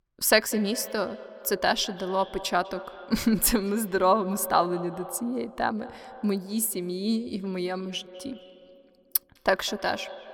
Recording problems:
echo of what is said; noticeable; throughout; 200 ms later, 15 dB below the speech

